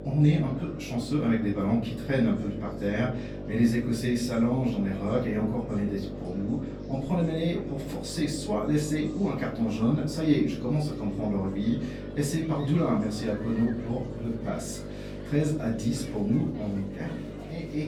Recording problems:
off-mic speech; far
echo of what is said; noticeable; throughout; 120 ms later, 15 dB below the speech
room echo; slight; dies away in 0.4 s
electrical hum; noticeable; throughout; 50 Hz, 10 dB below the speech
murmuring crowd; faint; throughout; 20 dB below the speech

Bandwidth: 19 kHz